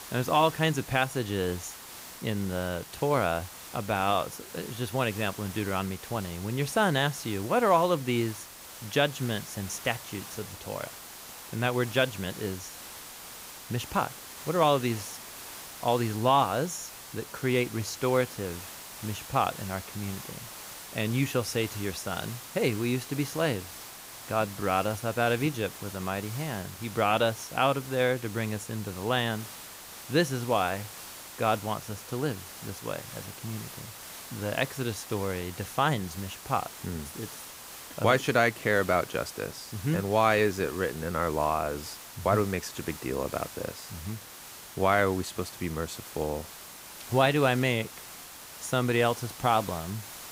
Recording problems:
hiss; noticeable; throughout; 15 dB below the speech

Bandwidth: 15.5 kHz